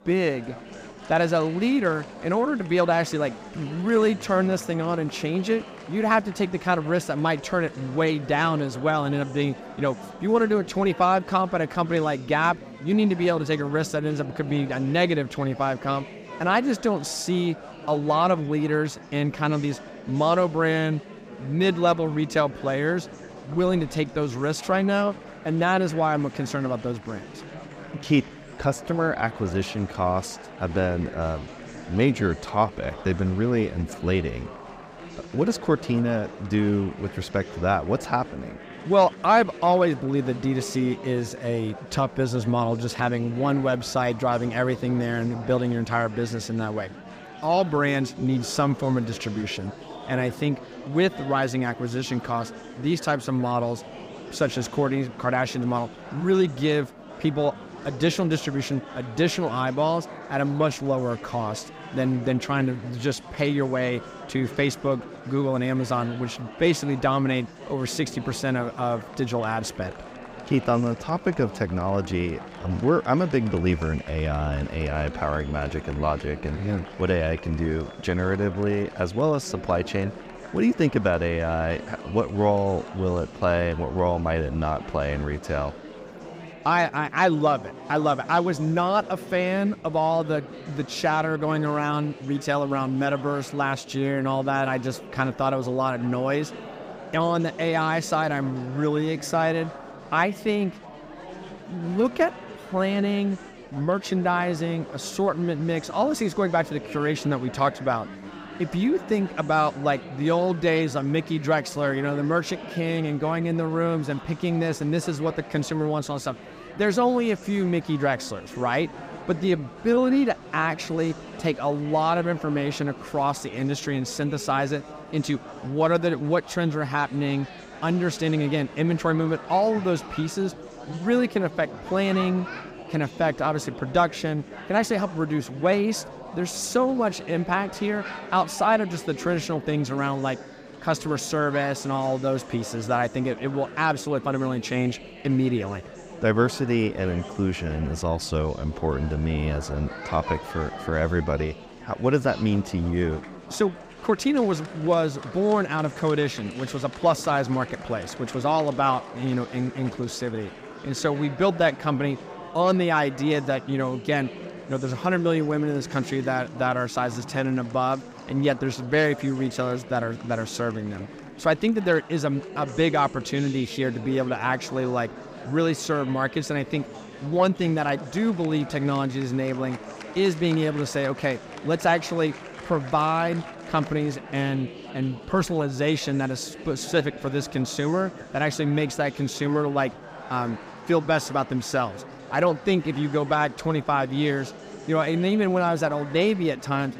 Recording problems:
murmuring crowd; noticeable; throughout; 15 dB below the speech

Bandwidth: 15.5 kHz